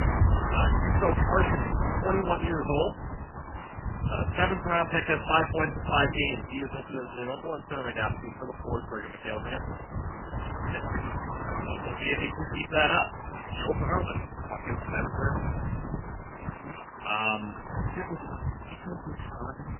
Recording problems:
garbled, watery; badly; nothing above 3 kHz
wind noise on the microphone; heavy; 7 dB below the speech

